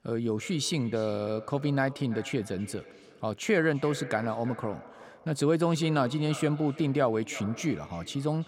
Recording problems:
echo of what is said; noticeable; throughout; 340 ms later, 15 dB below the speech

